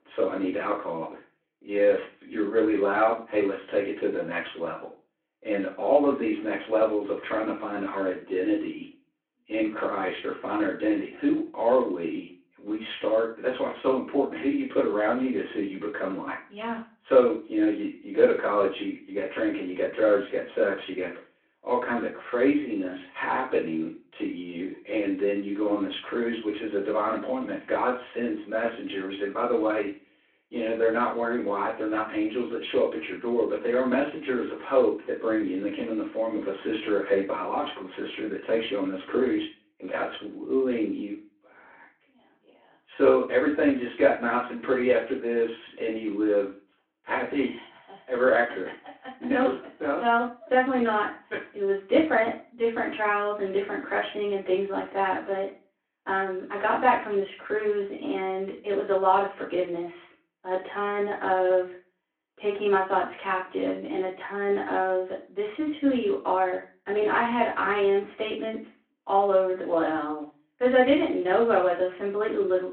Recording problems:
off-mic speech; far
room echo; slight; dies away in 0.3 s
phone-call audio

